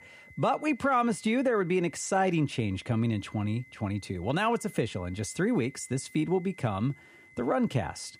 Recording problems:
high-pitched whine; faint; throughout; 2 kHz, 25 dB below the speech

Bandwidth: 15 kHz